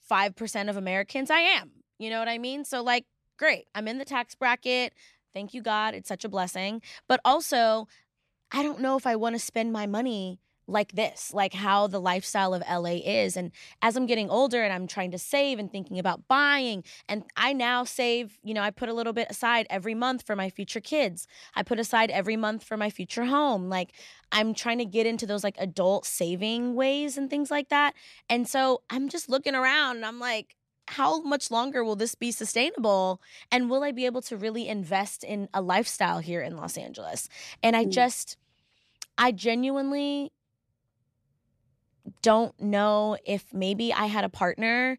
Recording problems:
none

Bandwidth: 14 kHz